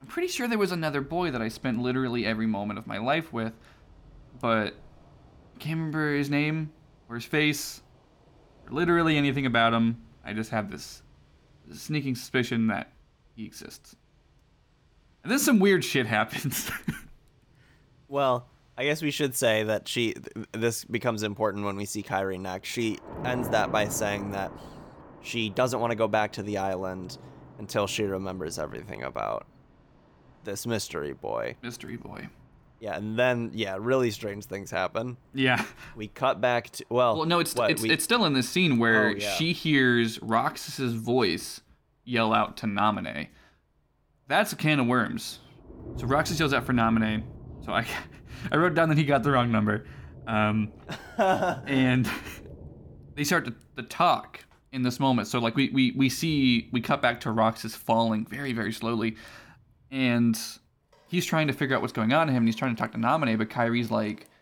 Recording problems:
rain or running water; noticeable; throughout; 20 dB below the speech

